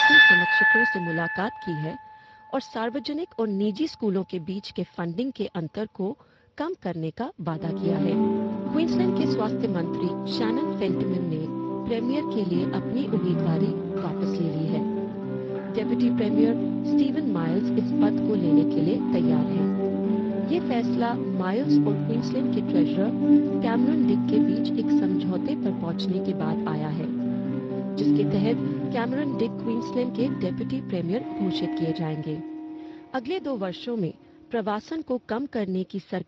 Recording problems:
garbled, watery; slightly
background music; very loud; throughout; 4 dB above the speech

